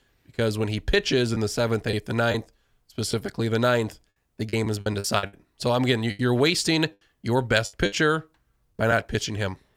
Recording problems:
choppy; very; 7% of the speech affected

